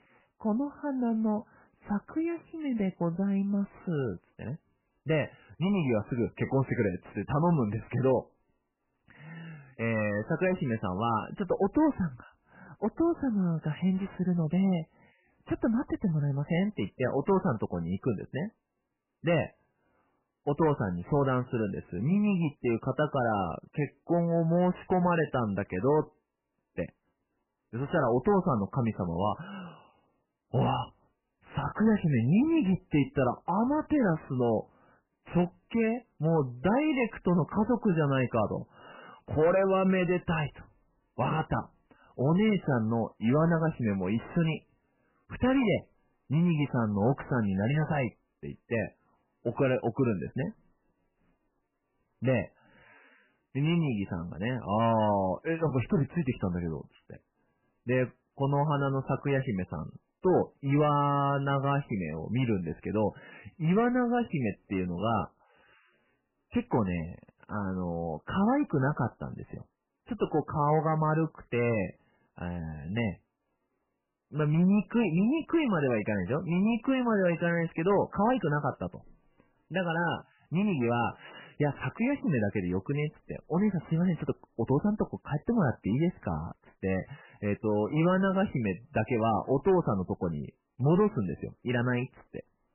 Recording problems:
garbled, watery; badly; nothing above 3 kHz
distortion; slight; 10 dB below the speech

